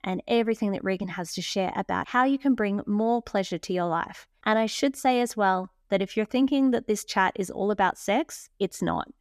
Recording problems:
none

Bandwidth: 14.5 kHz